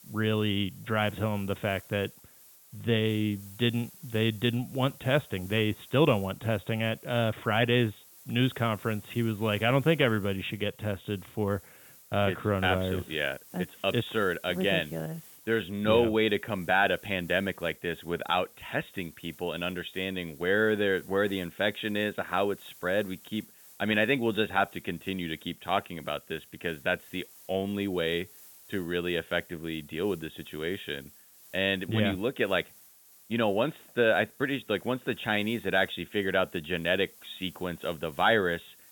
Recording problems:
high frequencies cut off; severe; nothing above 4 kHz
hiss; faint; throughout; 20 dB below the speech

